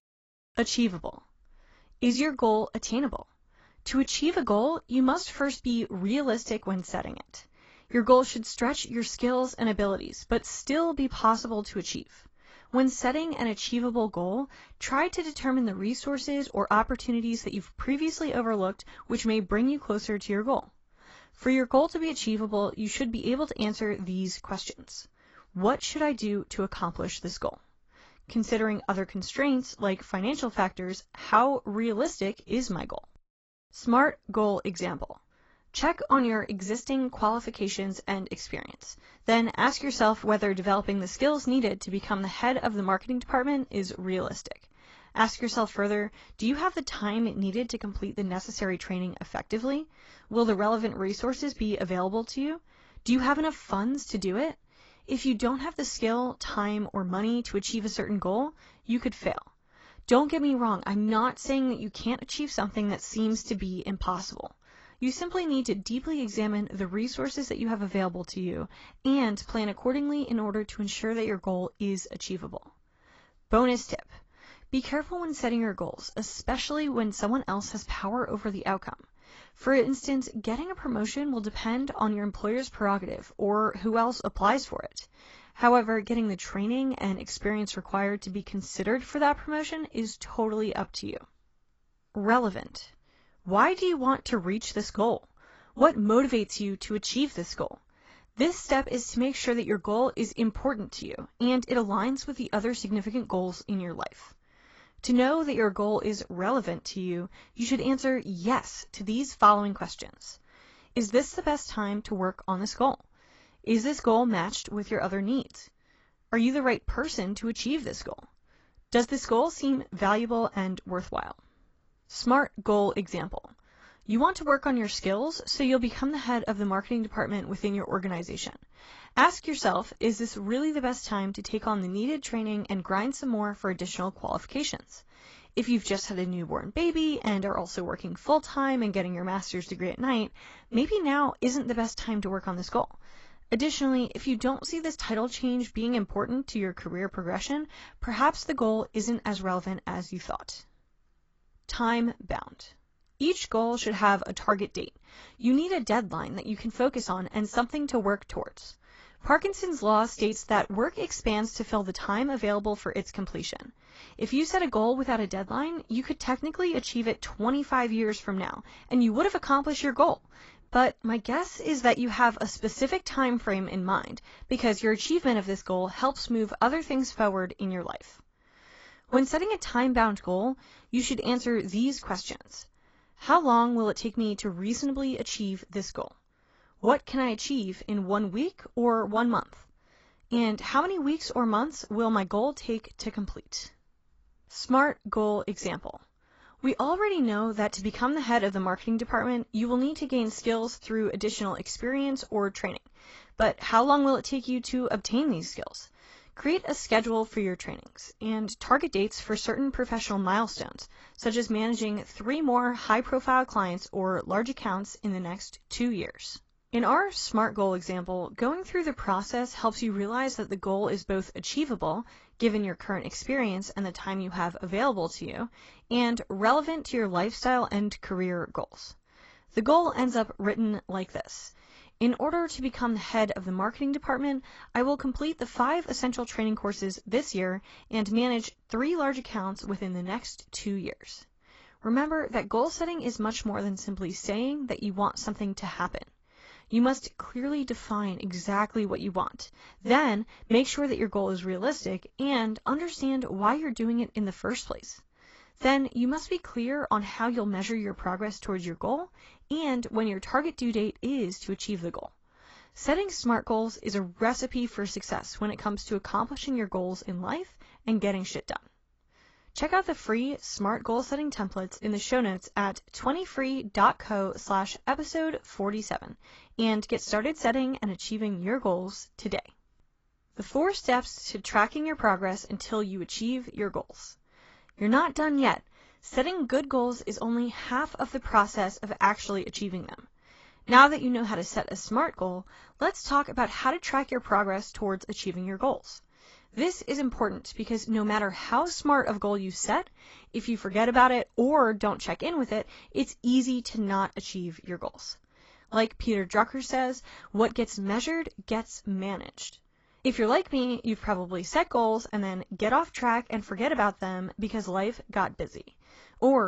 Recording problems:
garbled, watery; badly; nothing above 7.5 kHz
abrupt cut into speech; at the end

